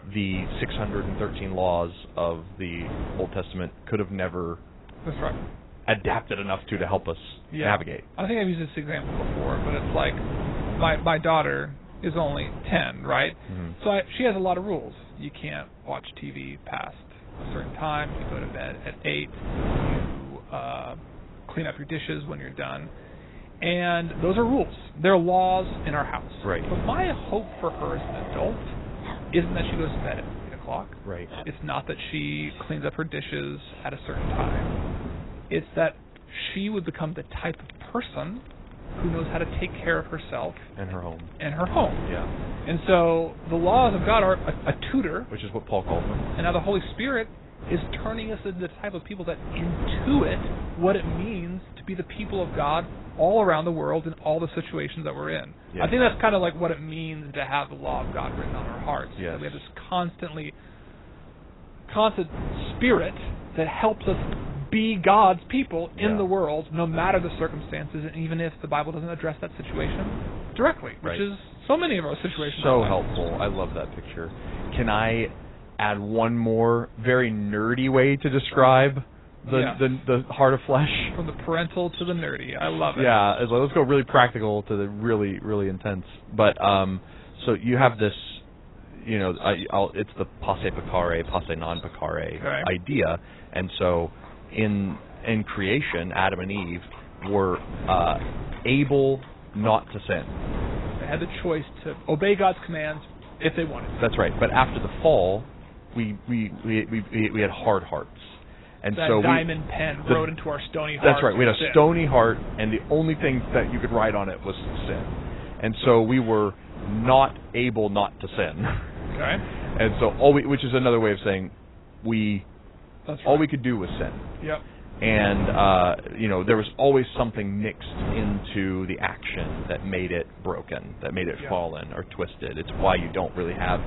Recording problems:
garbled, watery; badly; nothing above 4 kHz
wind noise on the microphone; occasional gusts; 15 dB below the speech
animal sounds; faint; throughout; 25 dB below the speech

